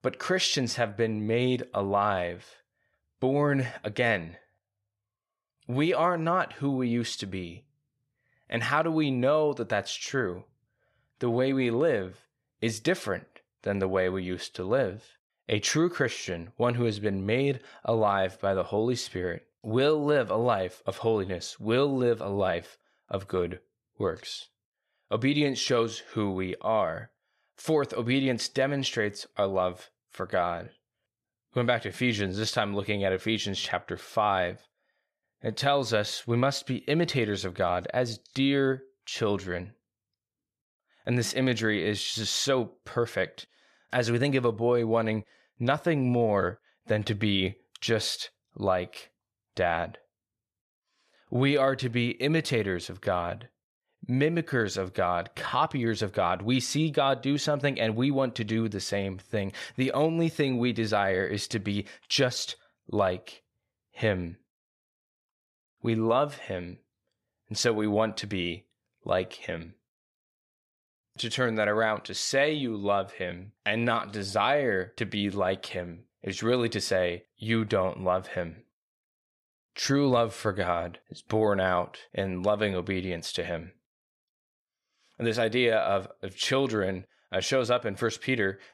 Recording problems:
none

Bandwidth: 14.5 kHz